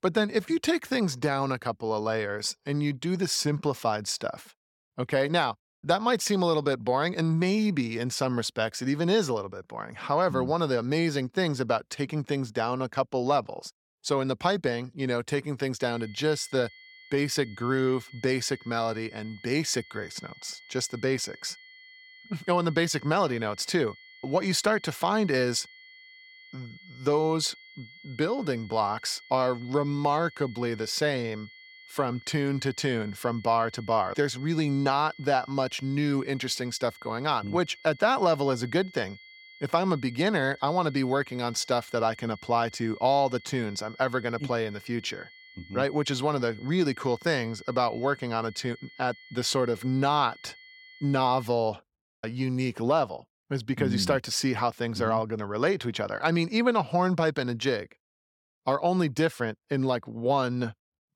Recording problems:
high-pitched whine; faint; from 16 to 51 s; 2 kHz, 20 dB below the speech

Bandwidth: 17 kHz